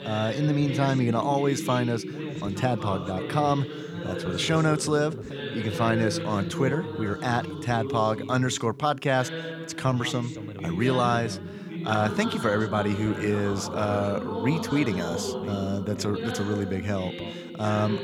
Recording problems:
background chatter; loud; throughout; 2 voices, 6 dB below the speech

